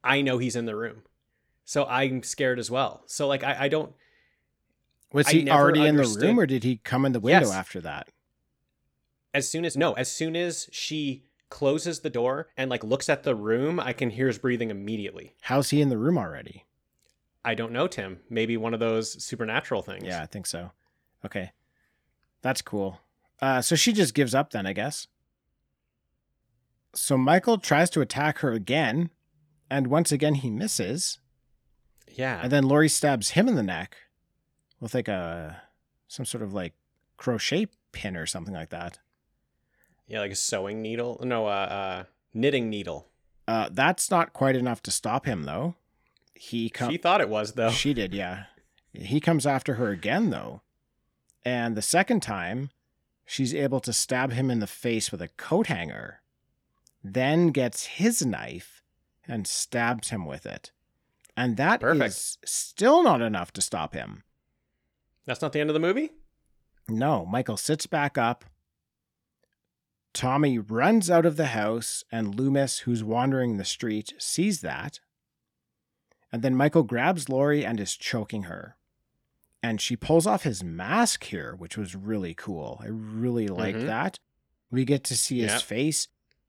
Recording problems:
uneven, jittery; strongly; from 9 s to 1:26

